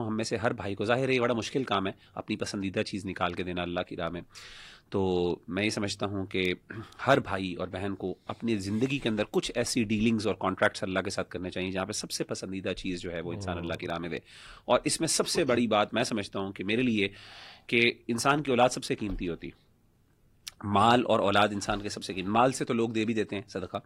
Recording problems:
garbled, watery; slightly; nothing above 16.5 kHz
abrupt cut into speech; at the start

